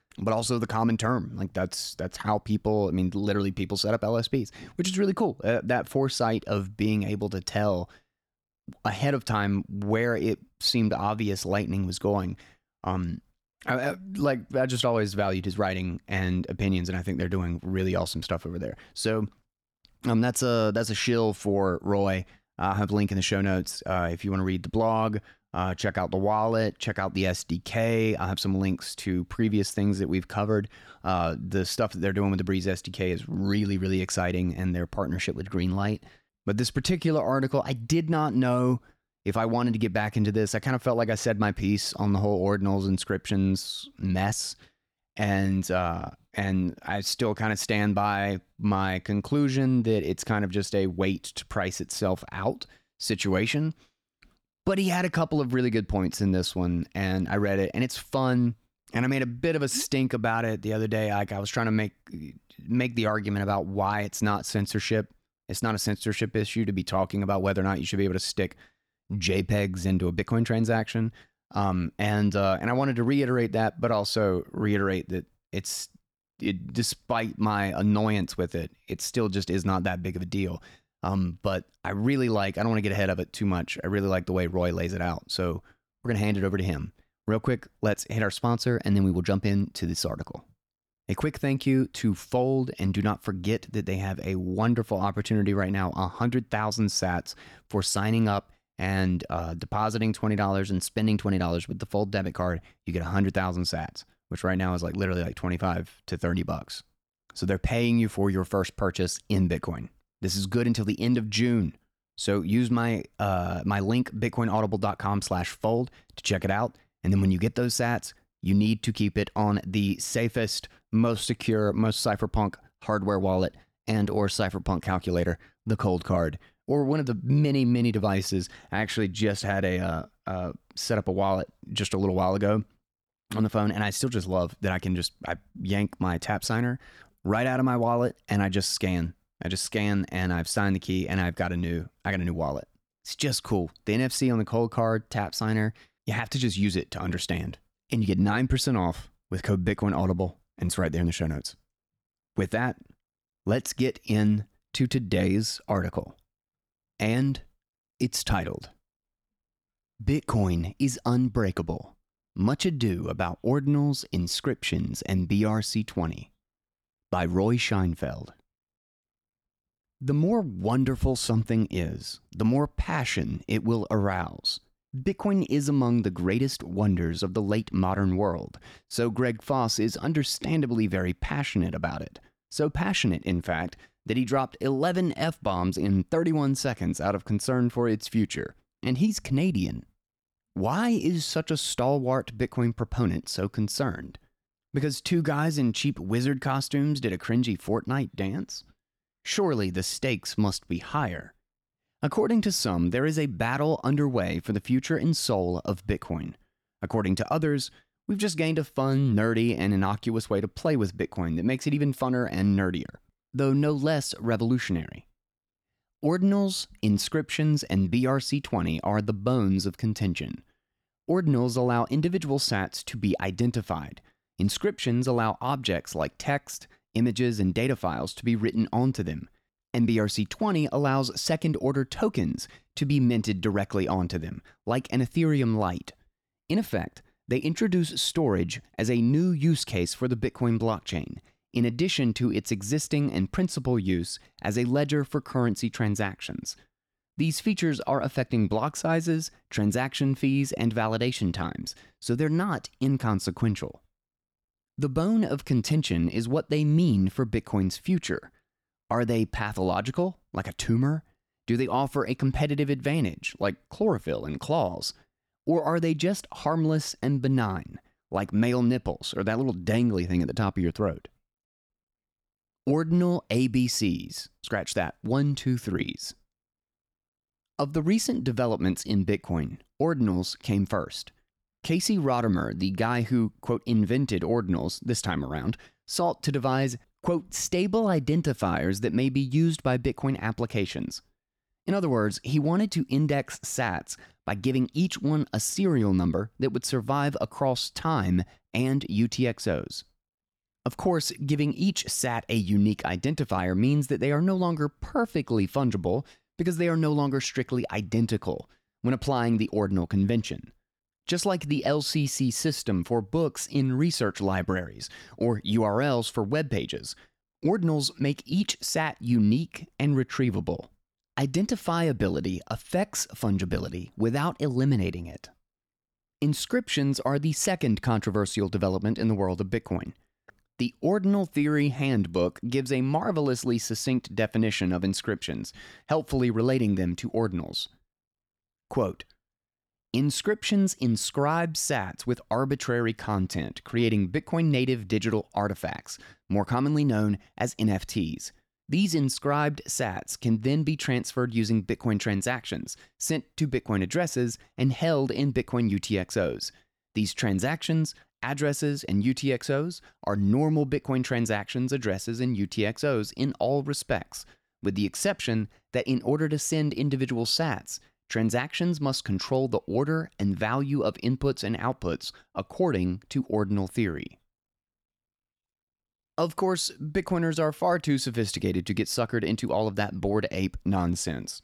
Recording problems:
none

